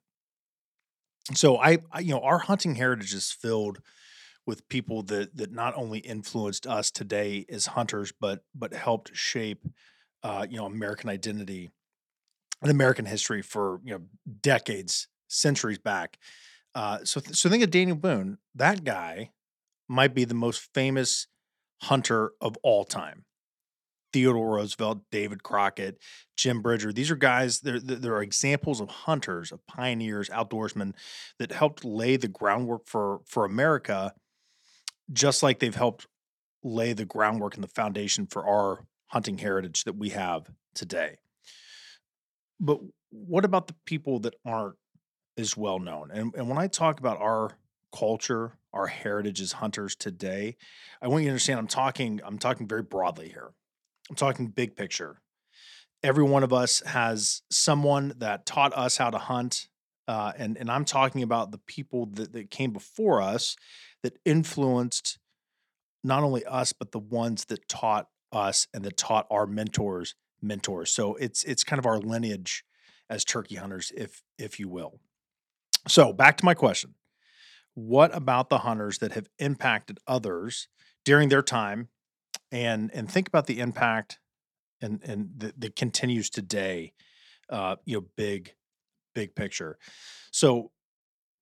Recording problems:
none

